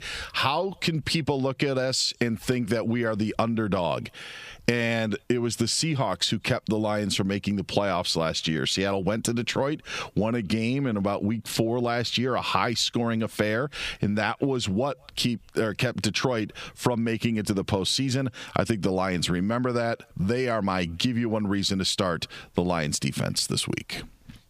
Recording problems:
squashed, flat; somewhat

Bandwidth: 15 kHz